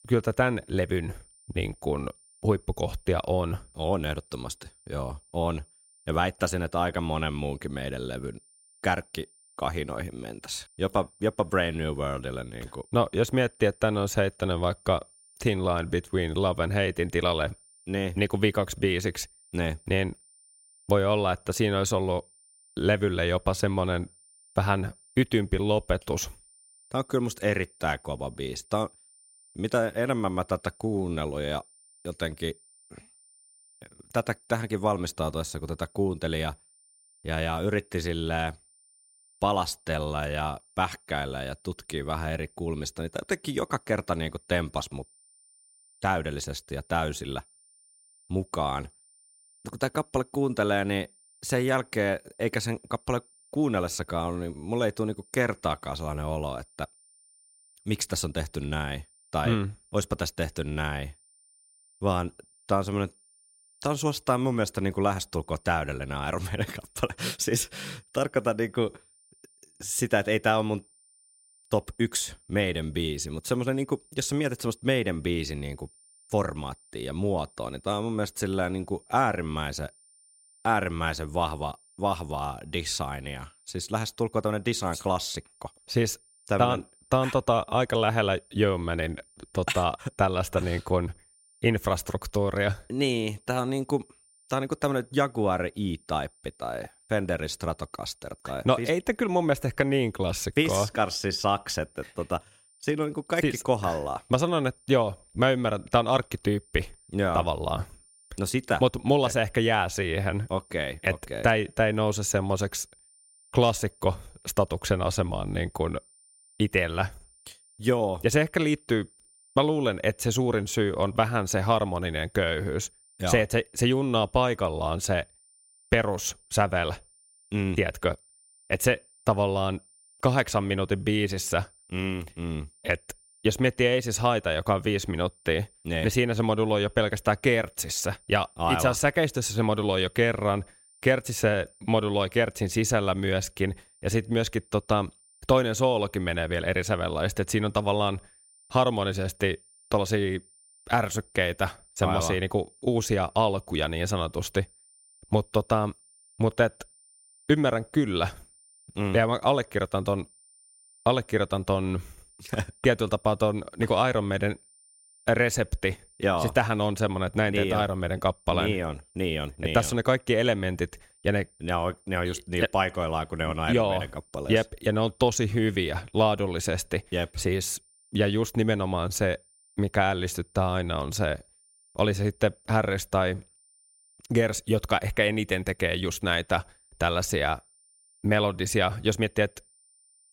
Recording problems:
high-pitched whine; faint; throughout; 9 kHz, 30 dB below the speech

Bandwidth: 16 kHz